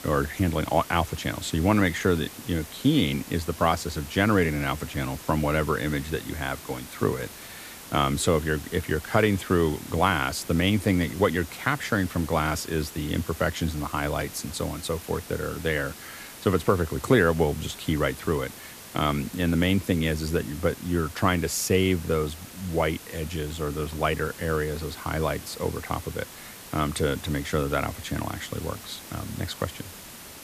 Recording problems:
hiss; noticeable; throughout; 15 dB below the speech

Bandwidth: 14.5 kHz